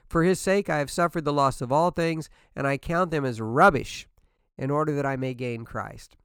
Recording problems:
none

